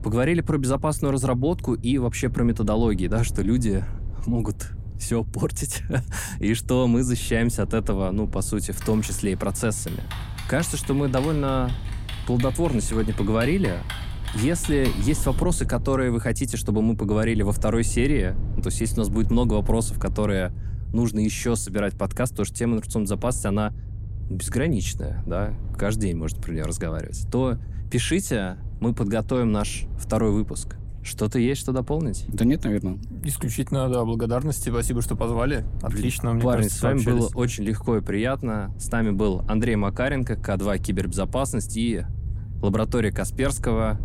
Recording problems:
low rumble; faint; throughout; 20 dB below the speech
keyboard typing; noticeable; from 9 to 15 s; peak 9 dB below the speech

